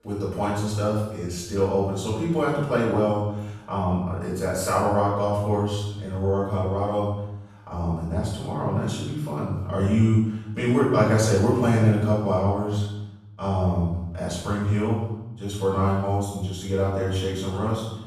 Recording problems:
off-mic speech; far
room echo; noticeable; dies away in 0.8 s

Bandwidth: 14 kHz